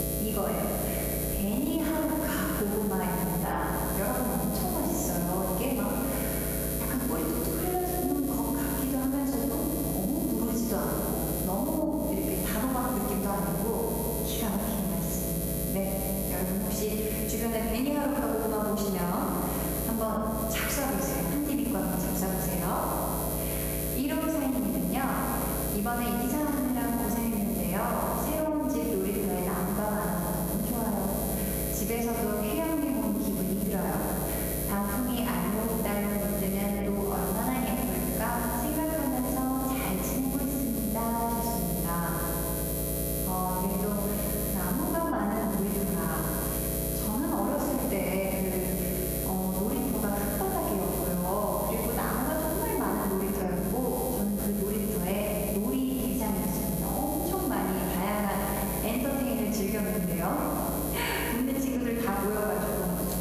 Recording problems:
off-mic speech; far
room echo; noticeable; dies away in 1.7 s
squashed, flat; somewhat
electrical hum; loud; throughout; 60 Hz, 5 dB below the speech

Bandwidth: 14.5 kHz